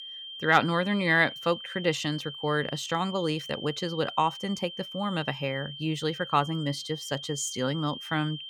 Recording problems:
high-pitched whine; noticeable; throughout; 3 kHz, 10 dB below the speech

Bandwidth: 19 kHz